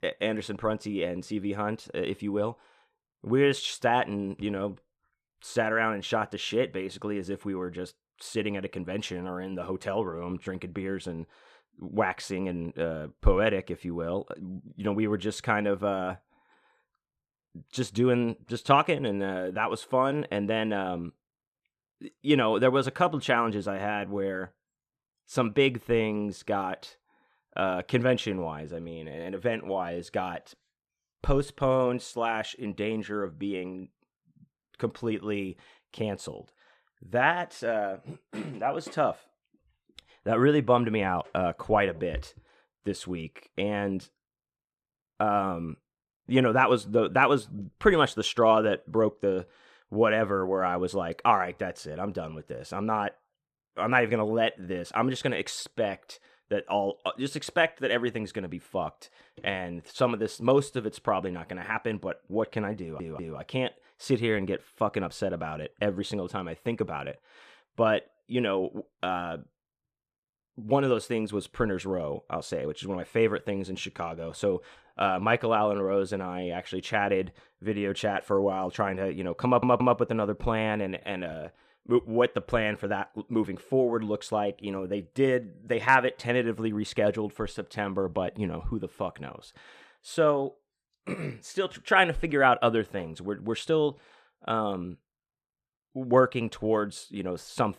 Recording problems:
audio stuttering; at 1:03 and at 1:19

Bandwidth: 14.5 kHz